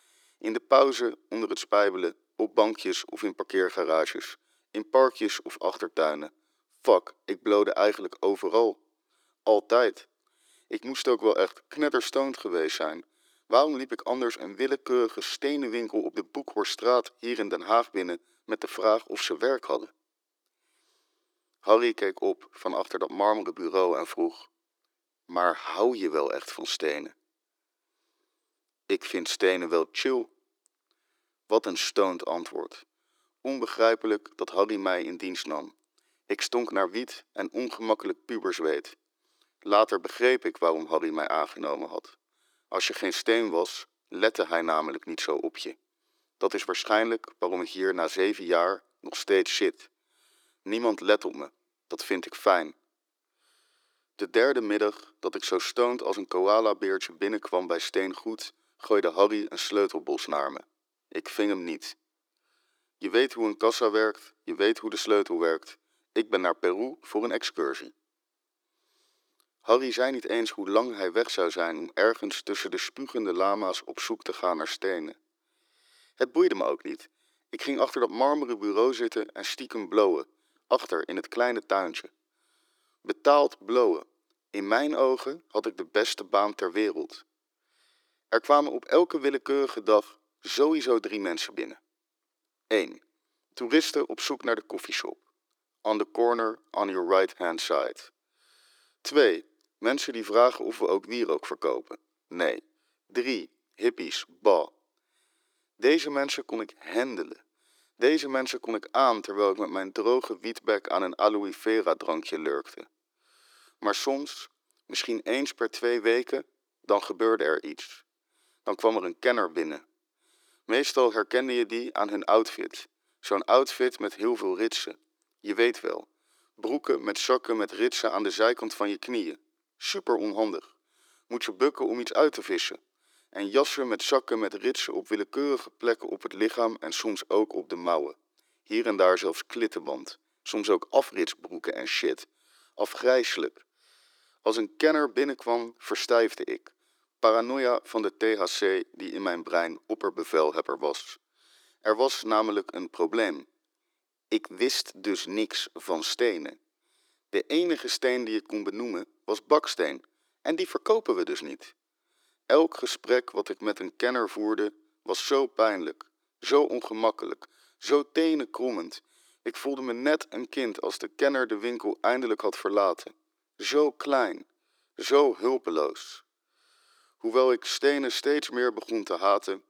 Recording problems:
thin; very; fading below 350 Hz

